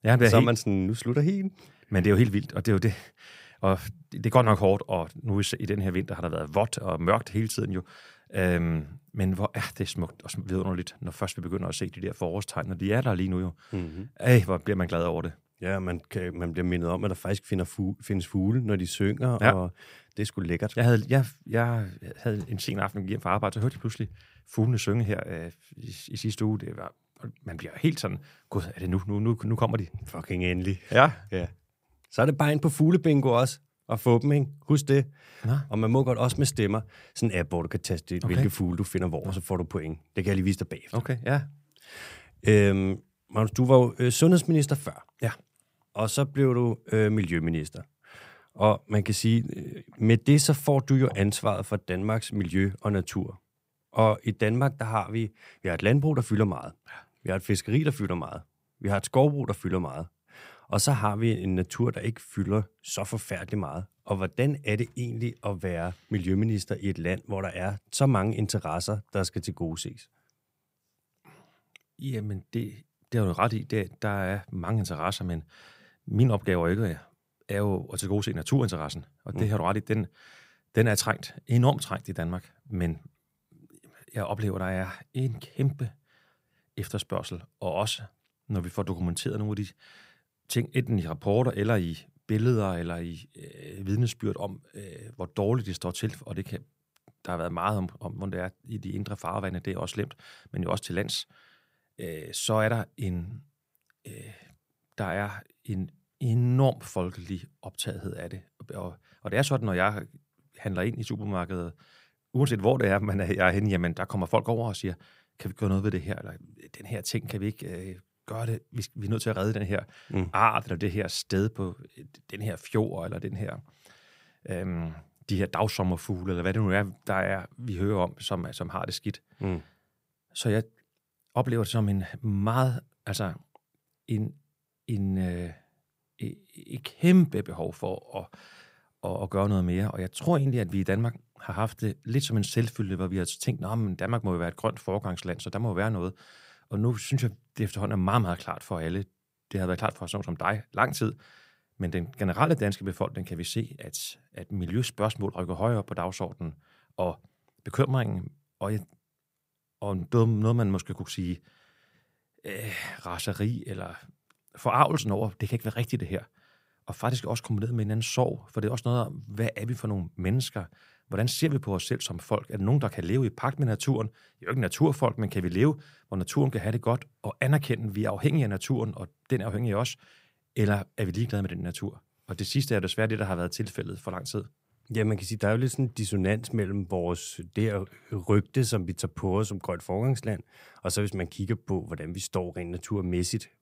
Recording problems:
none

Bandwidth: 15.5 kHz